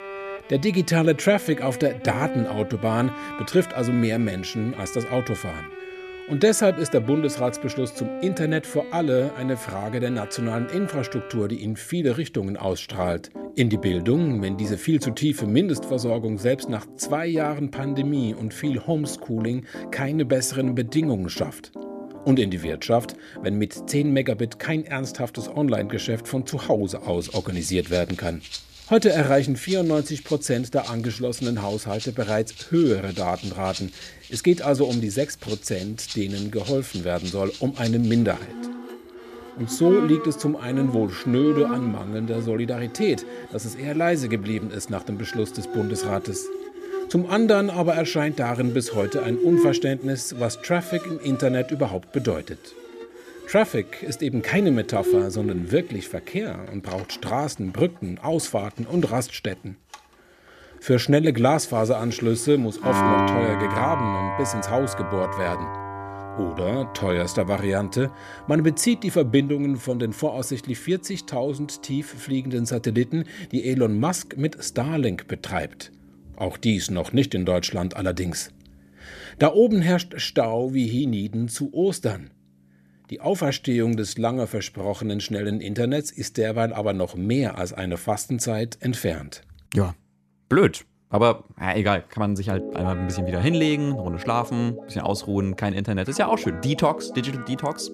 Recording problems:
background music; loud; throughout; 9 dB below the speech

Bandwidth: 14.5 kHz